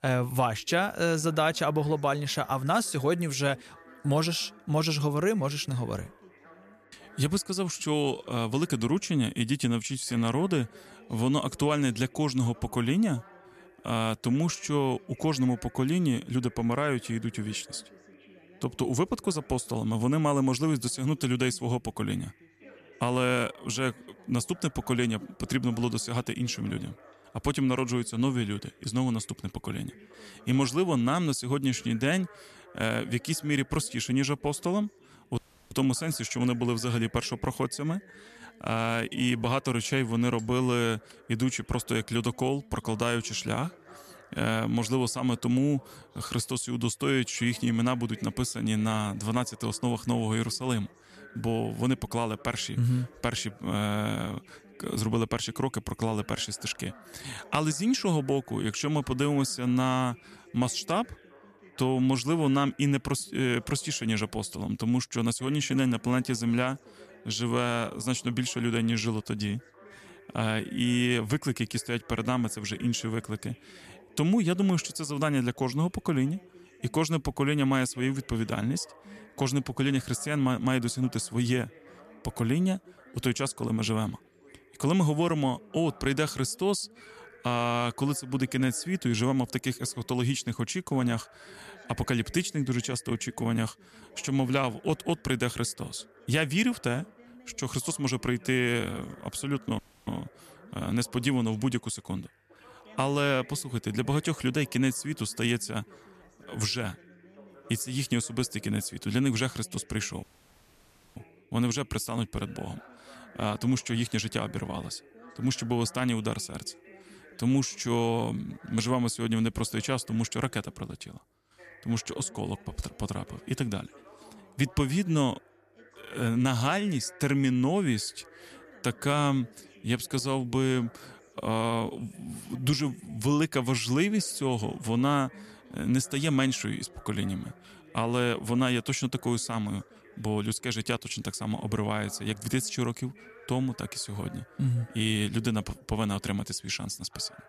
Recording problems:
background chatter; faint; throughout; 2 voices, 25 dB below the speech
audio cutting out; at 35 s, at 1:40 and at 1:50 for 1 s

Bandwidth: 14 kHz